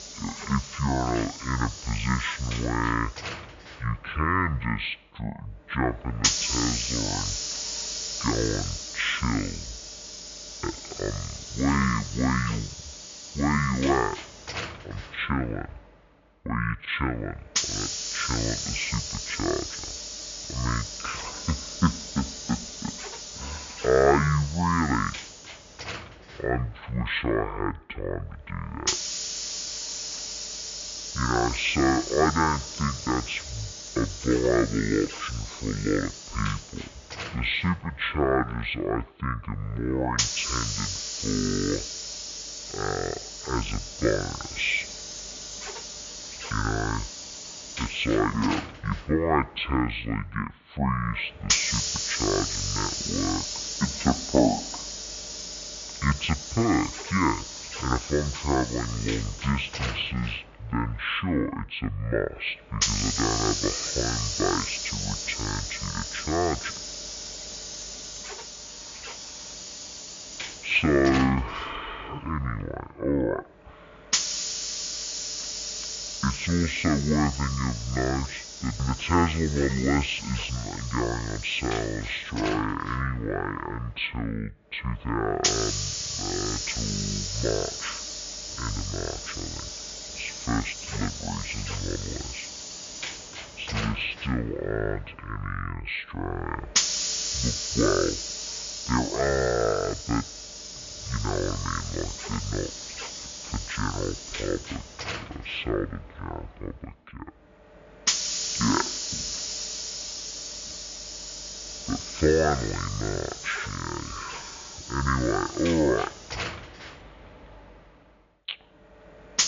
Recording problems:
high frequencies cut off; severe; nothing above 4 kHz
wrong speed and pitch; too slow and too low; 0.5 times normal speed
hiss; loud; throughout; 4 dB below the speech

